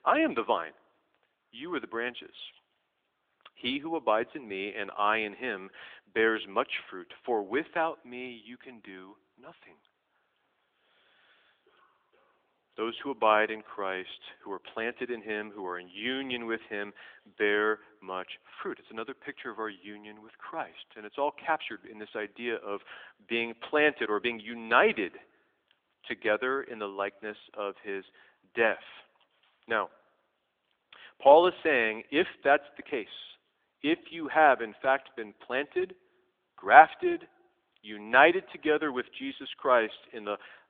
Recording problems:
phone-call audio; nothing above 3.5 kHz

